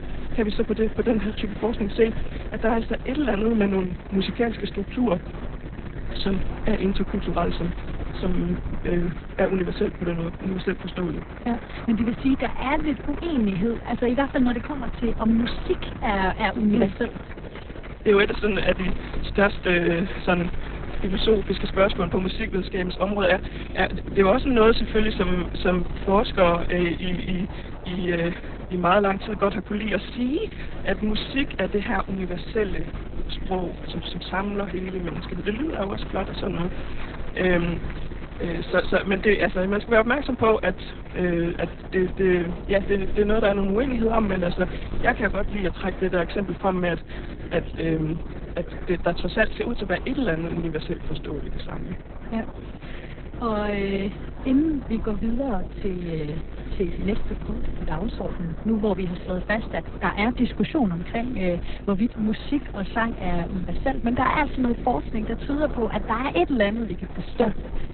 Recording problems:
garbled, watery; badly; nothing above 4 kHz
electrical hum; noticeable; throughout; 50 Hz, 20 dB below the speech
murmuring crowd; noticeable; throughout; 20 dB below the speech

